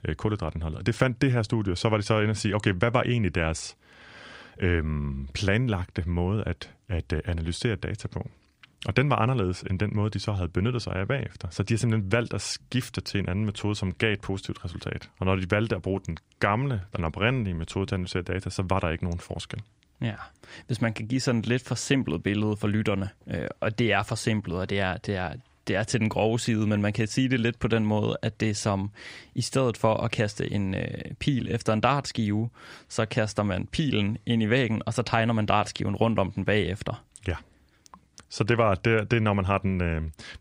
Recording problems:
none

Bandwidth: 15.5 kHz